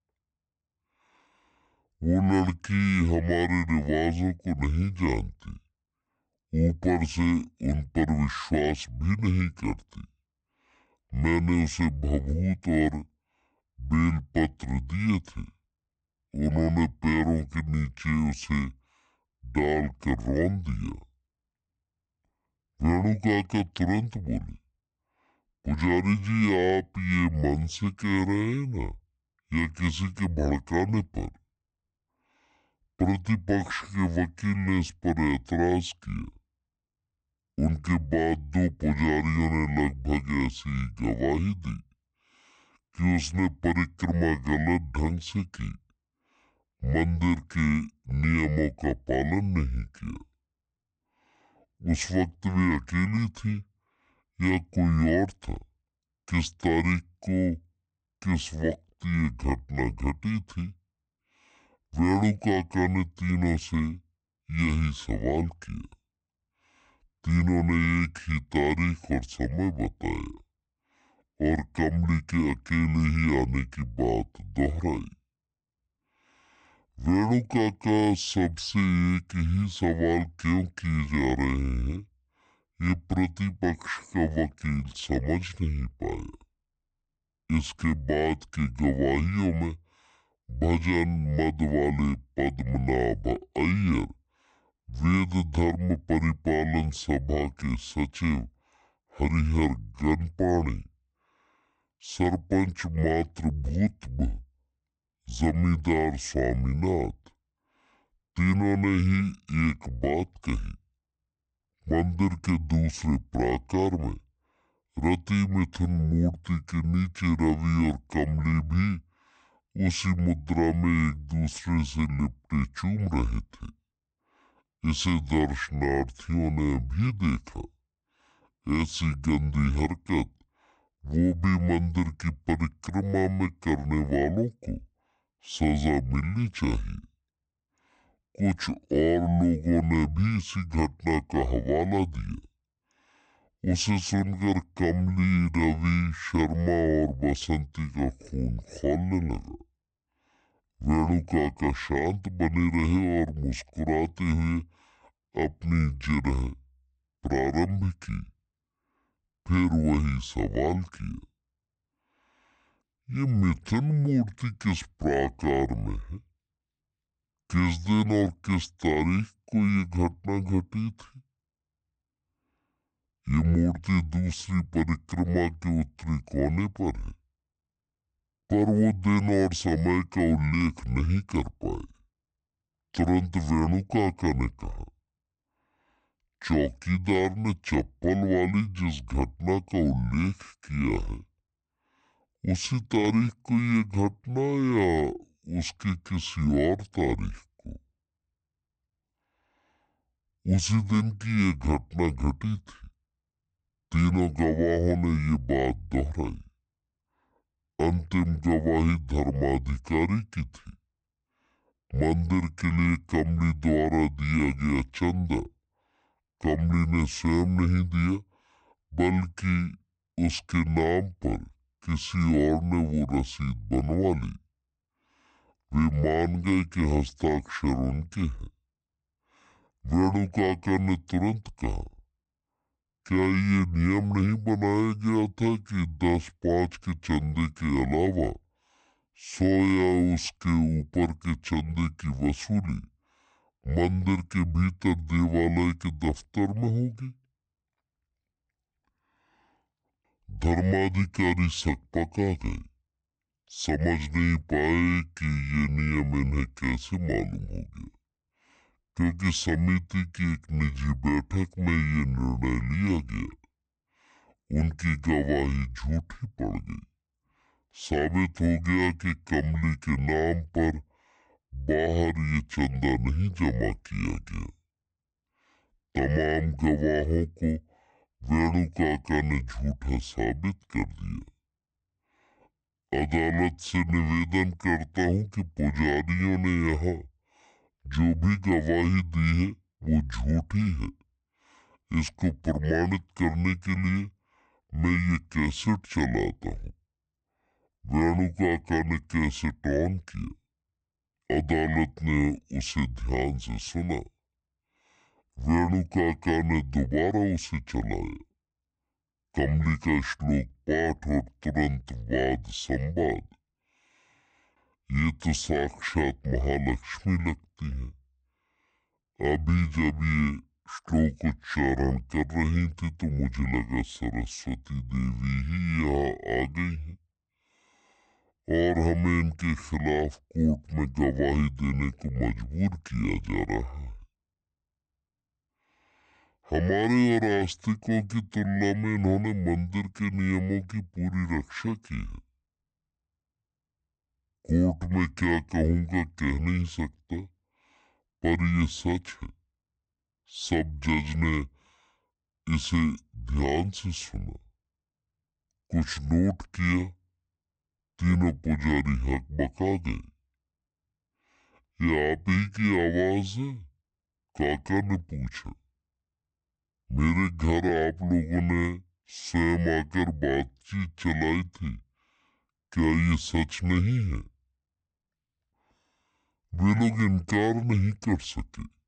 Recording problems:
wrong speed and pitch; too slow and too low; 0.6 times normal speed

